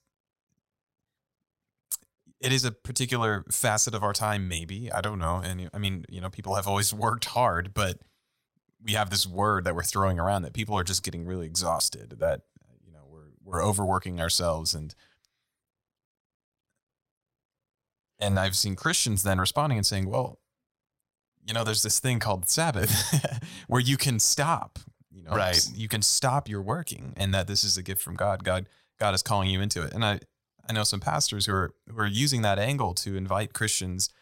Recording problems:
none

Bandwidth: 16 kHz